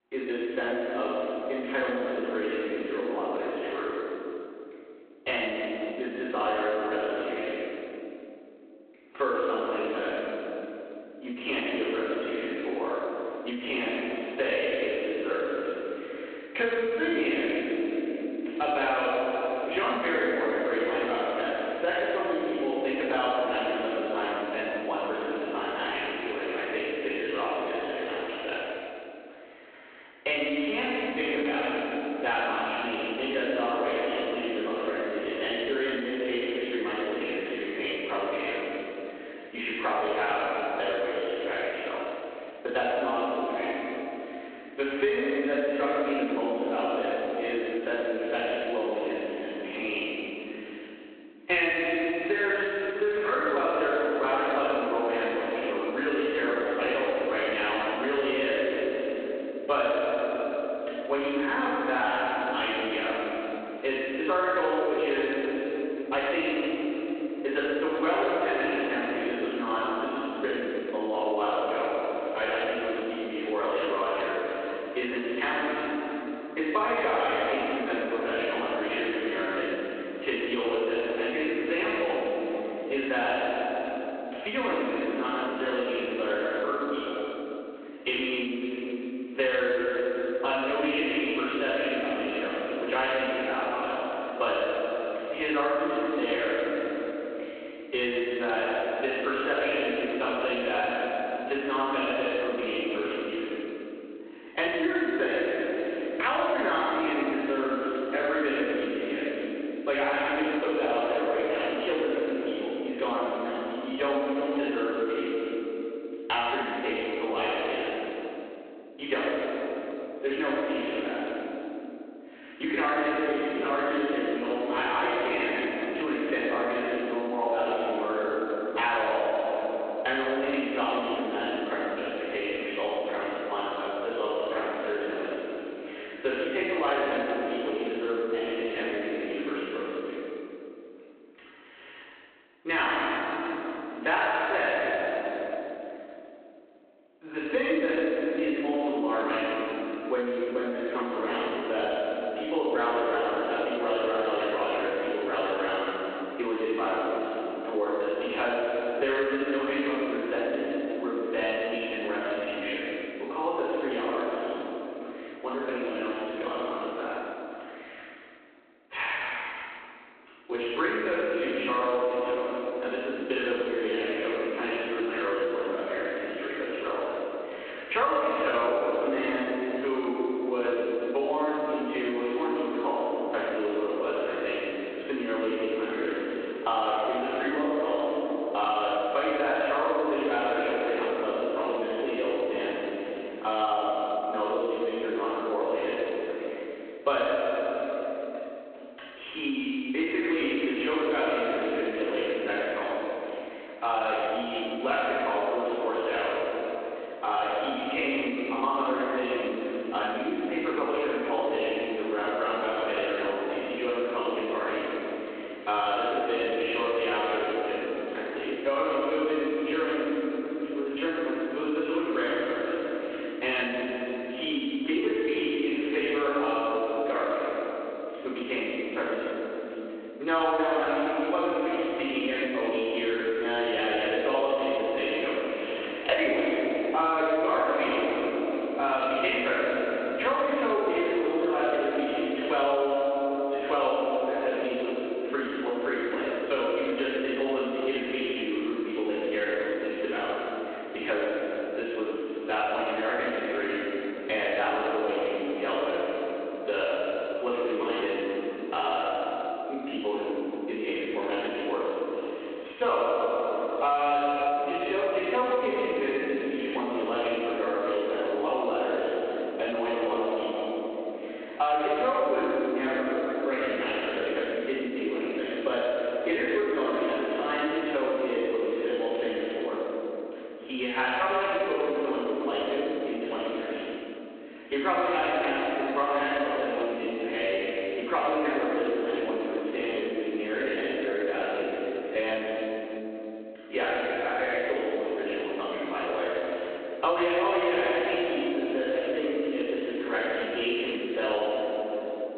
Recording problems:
phone-call audio; poor line
room echo; strong; dies away in 2.6 s
off-mic speech; far
squashed, flat; somewhat

